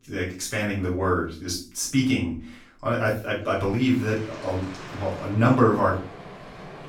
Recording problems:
off-mic speech; far
room echo; noticeable; dies away in 0.4 s
rain or running water; noticeable; from 4 s on; 15 dB below the speech

